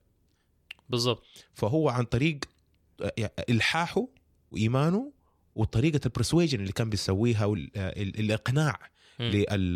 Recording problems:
abrupt cut into speech; at the end

